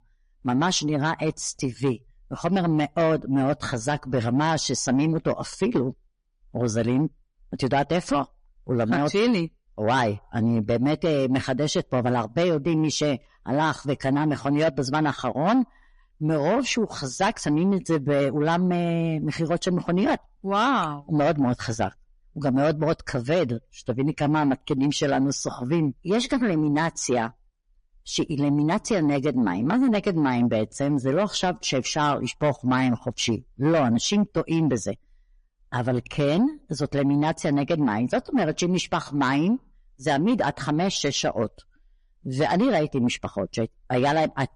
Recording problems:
distortion; slight; 10 dB below the speech
garbled, watery; slightly; nothing above 10.5 kHz

